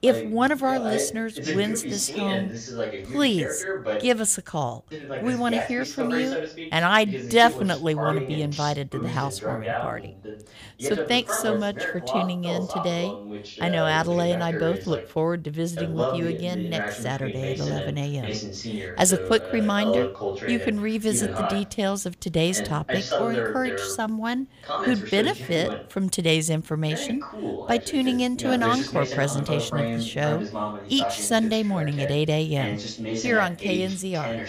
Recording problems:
voice in the background; loud; throughout; 6 dB below the speech

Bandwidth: 15 kHz